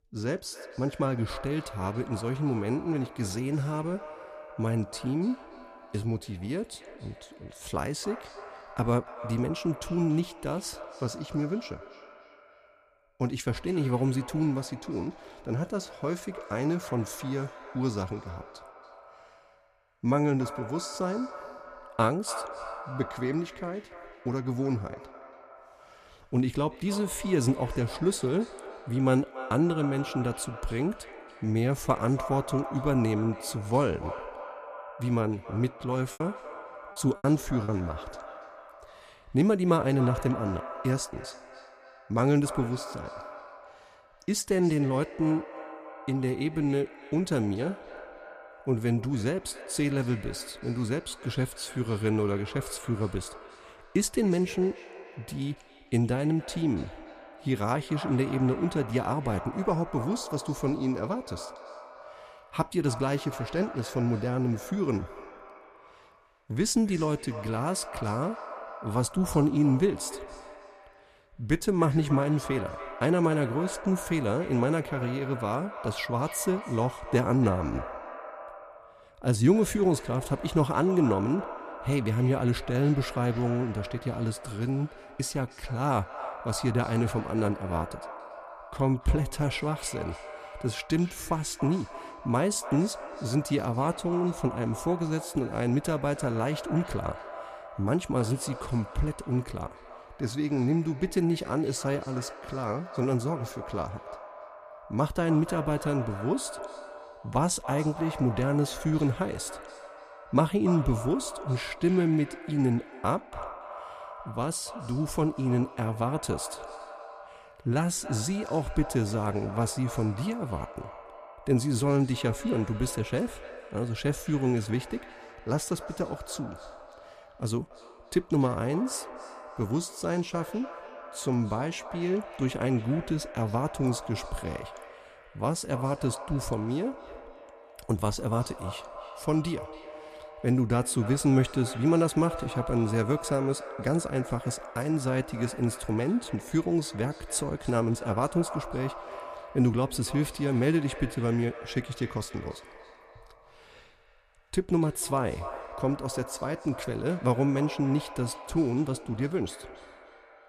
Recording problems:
echo of what is said; noticeable; throughout; 280 ms later, 15 dB below the speech
choppy; very; from 36 to 38 s; 7% of the speech affected

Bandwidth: 14.5 kHz